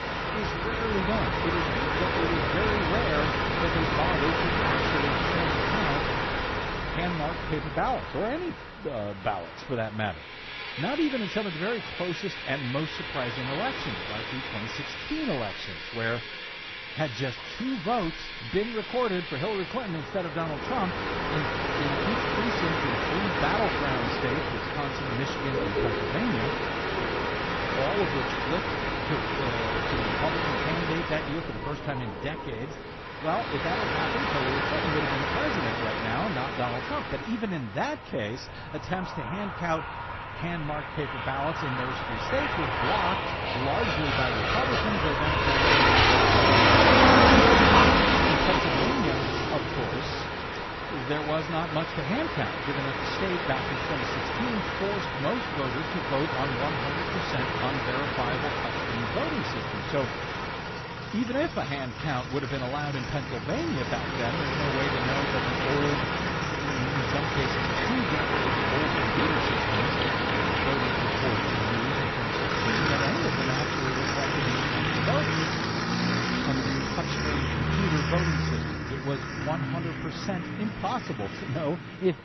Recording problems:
garbled, watery; slightly; nothing above 5.5 kHz
train or aircraft noise; very loud; throughout; 6 dB above the speech

